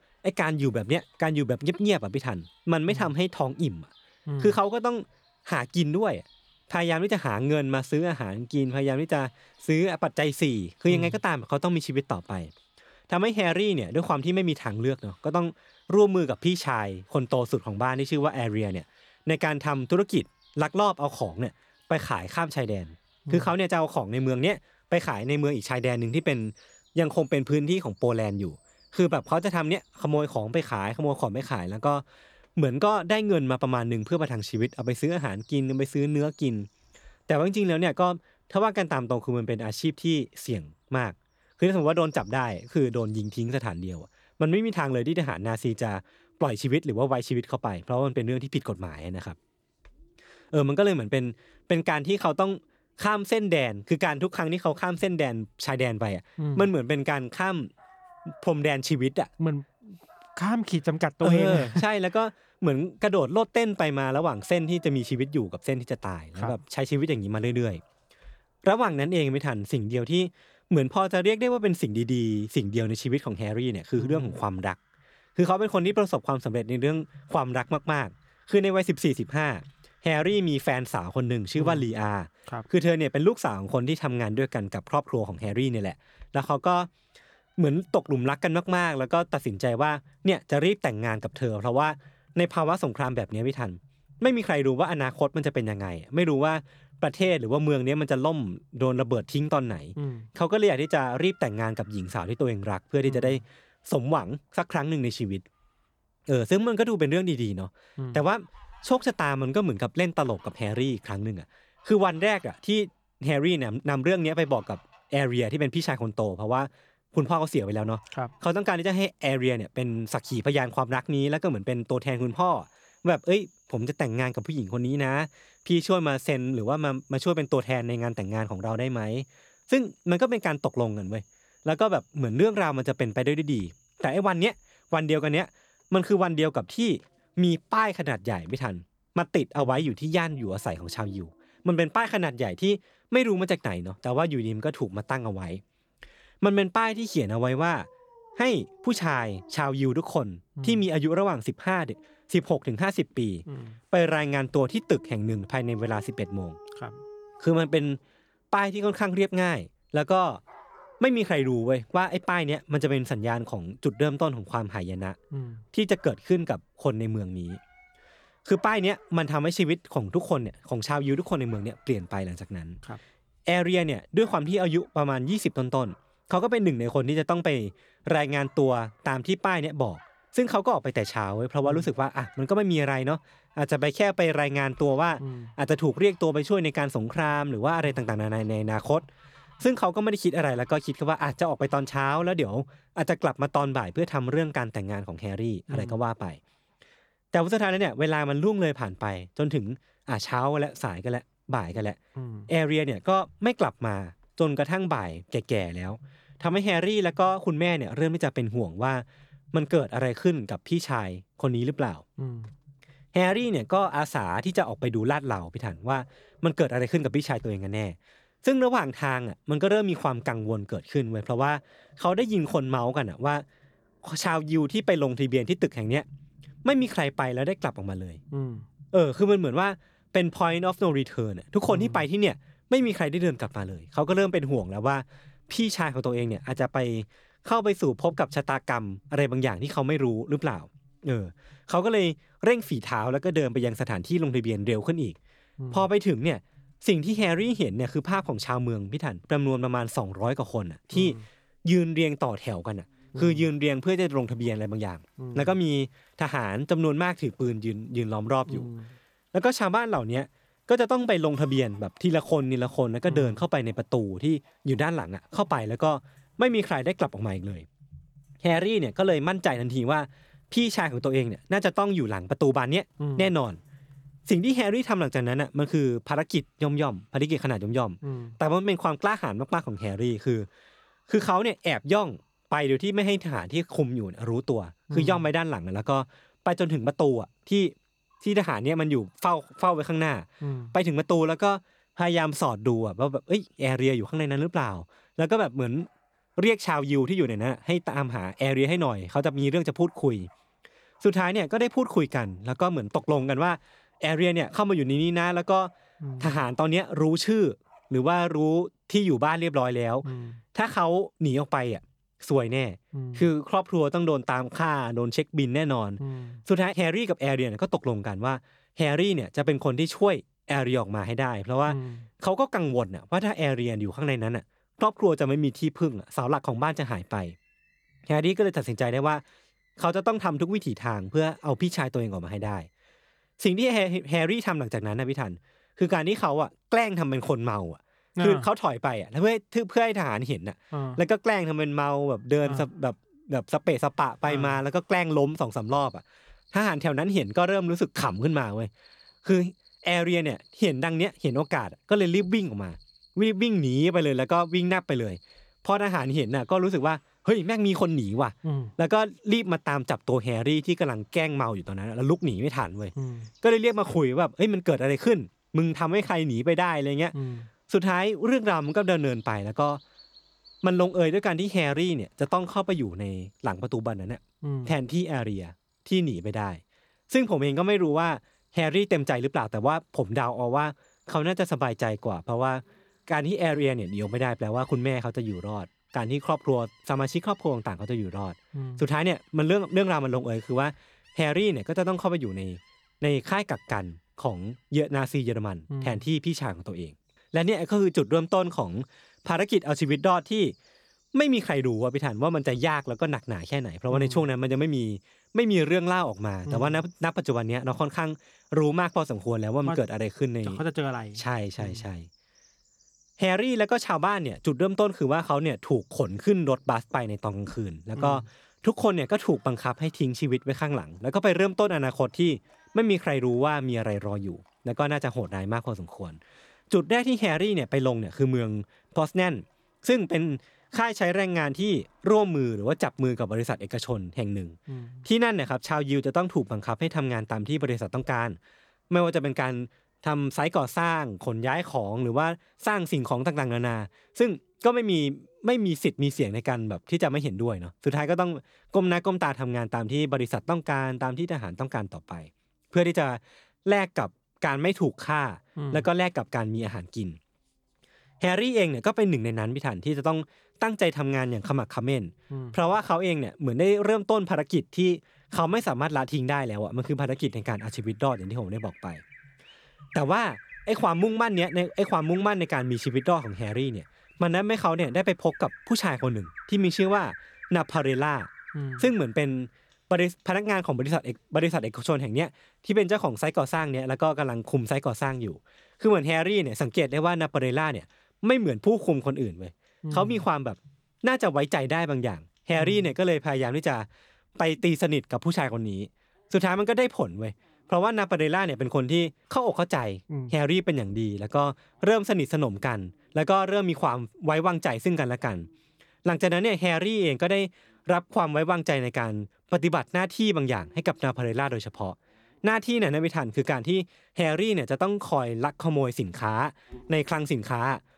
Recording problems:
animal sounds; faint; throughout; 30 dB below the speech

